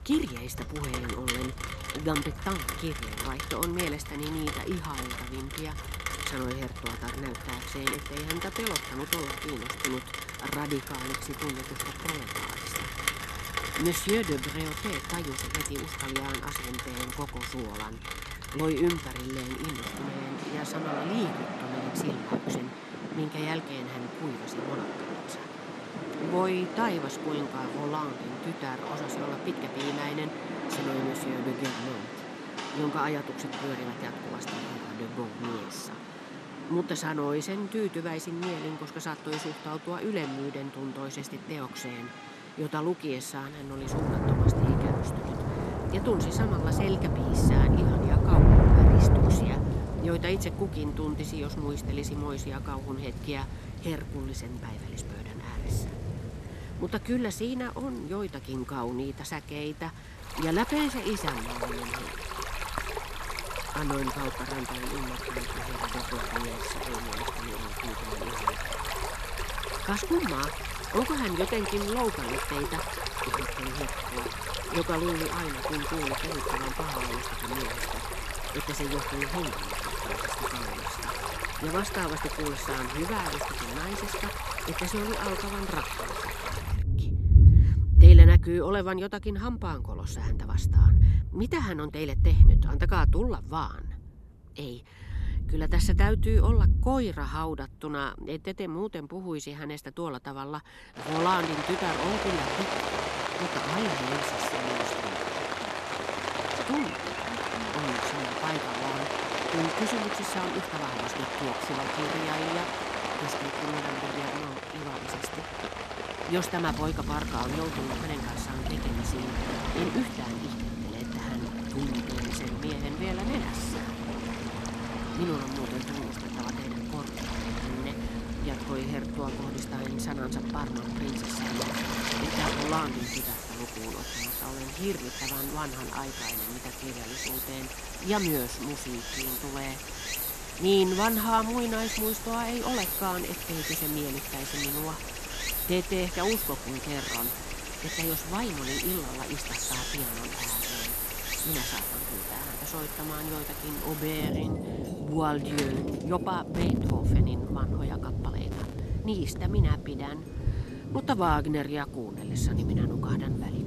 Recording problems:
rain or running water; very loud; throughout; 4 dB above the speech

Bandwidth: 13.5 kHz